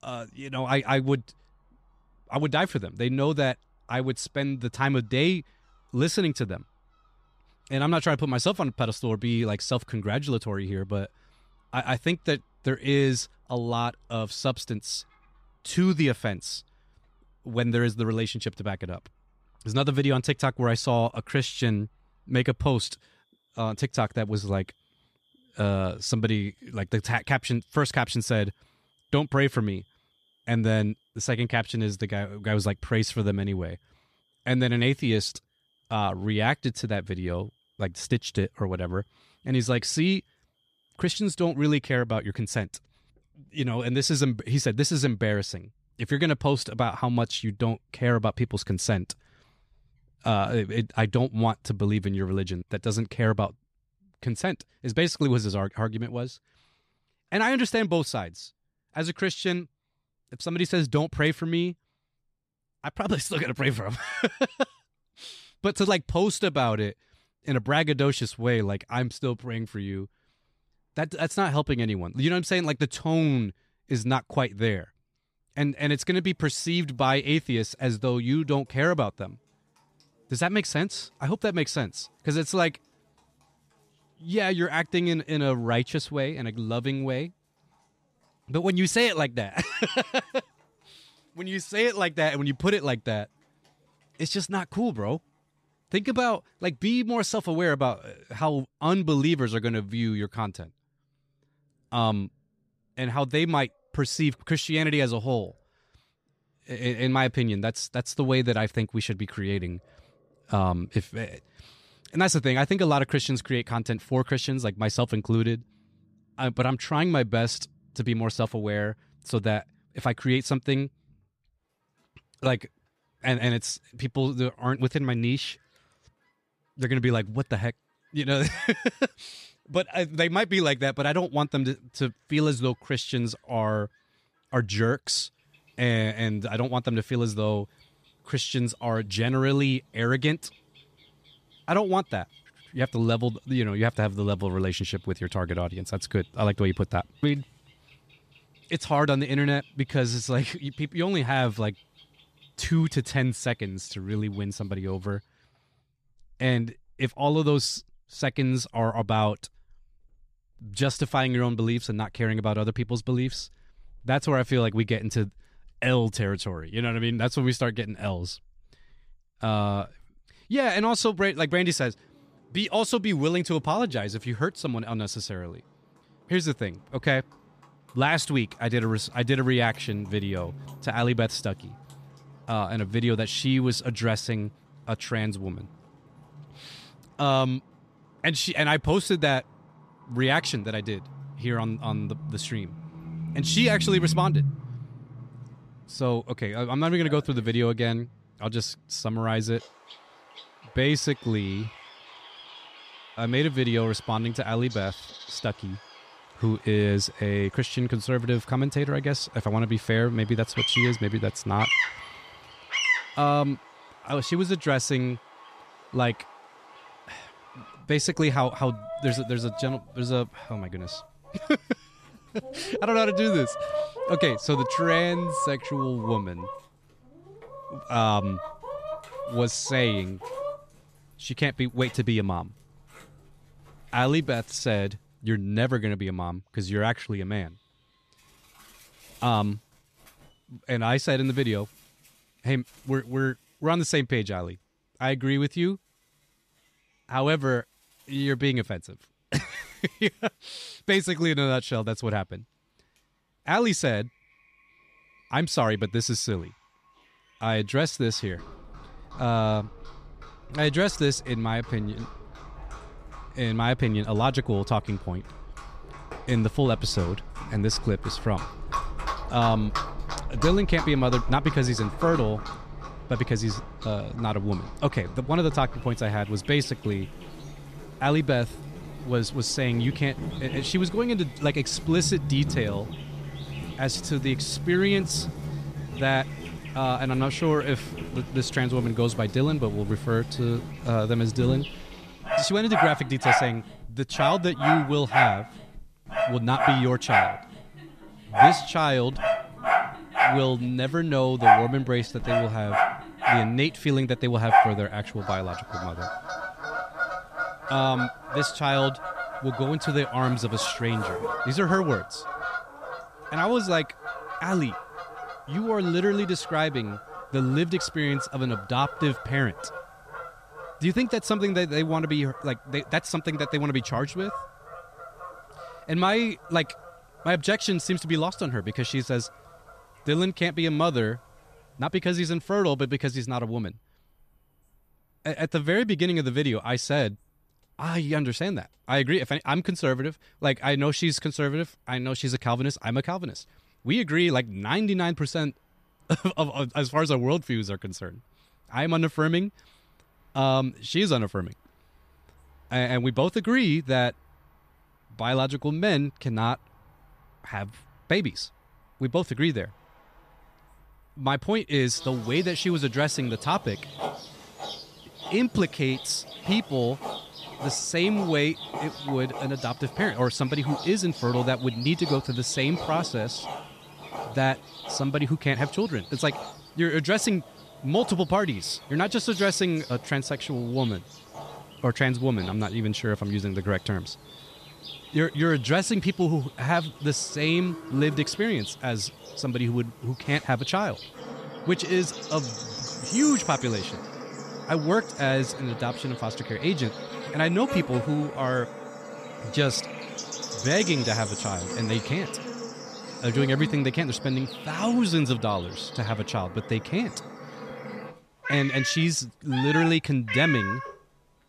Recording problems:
animal sounds; loud; throughout; 6 dB below the speech

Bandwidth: 14.5 kHz